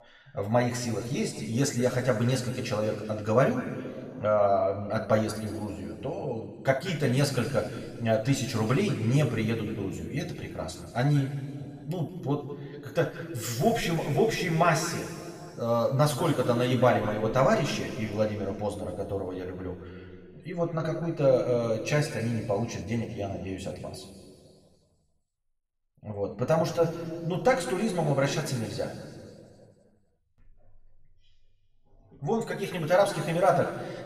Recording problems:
room echo; noticeable; dies away in 2.1 s
off-mic speech; somewhat distant

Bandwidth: 14.5 kHz